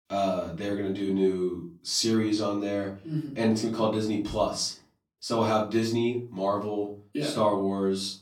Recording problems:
off-mic speech; far
room echo; slight; dies away in 0.4 s

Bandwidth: 17 kHz